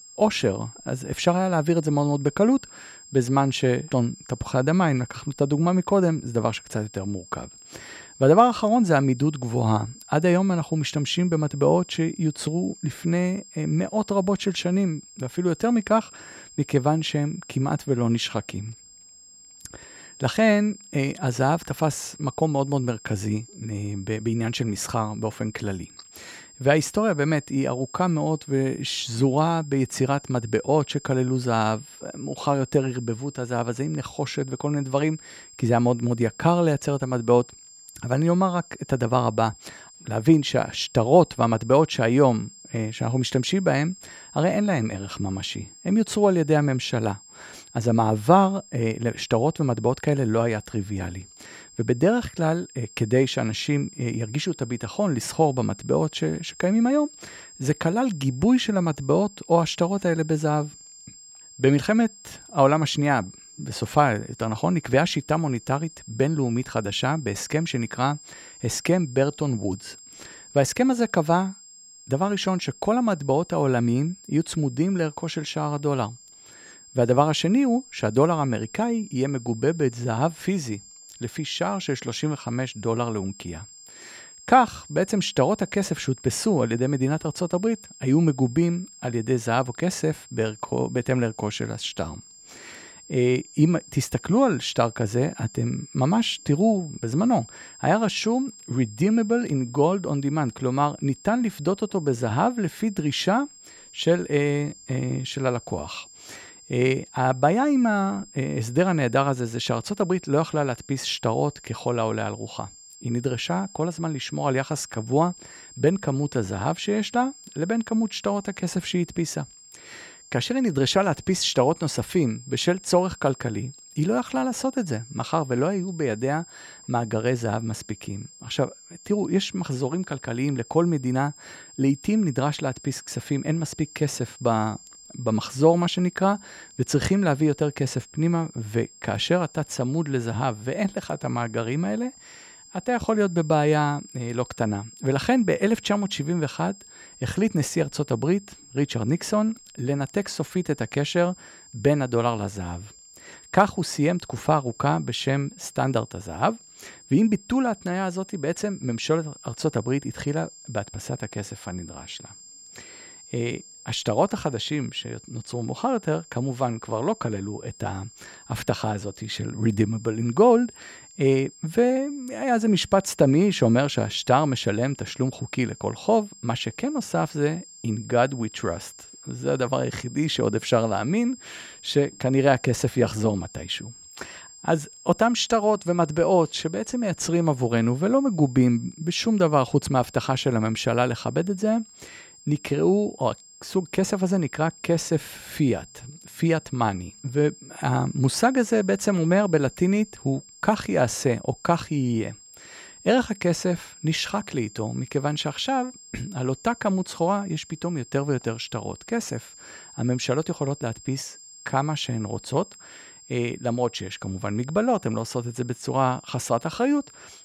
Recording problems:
high-pitched whine; faint; throughout; 7.5 kHz, 20 dB below the speech

